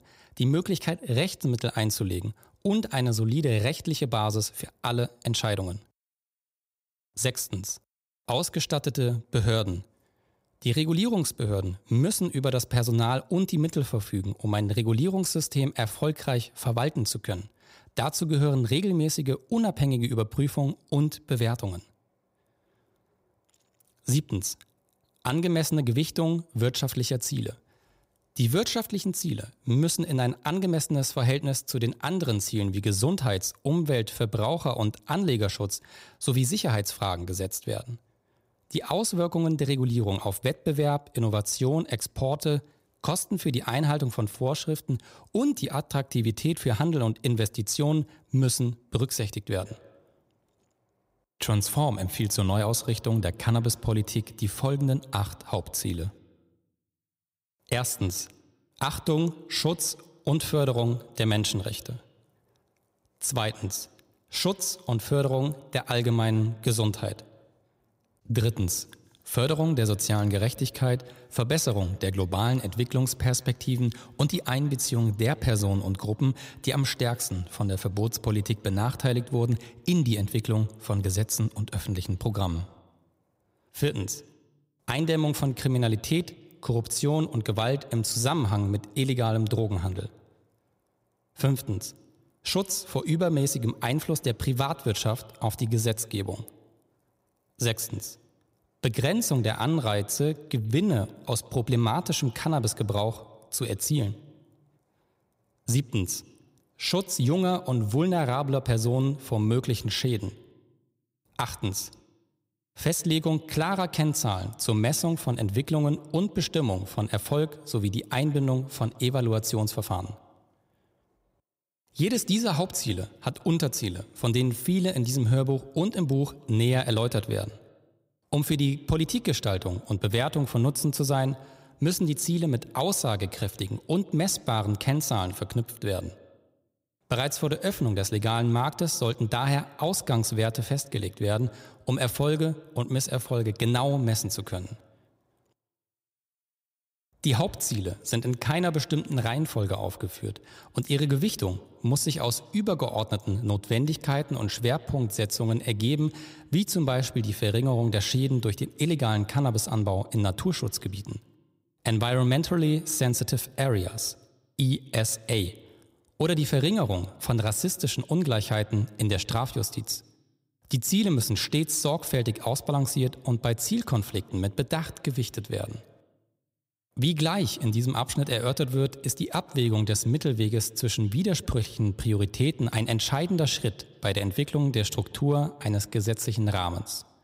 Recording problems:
echo of what is said; faint; from 50 s on; 140 ms later, 25 dB below the speech

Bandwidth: 15.5 kHz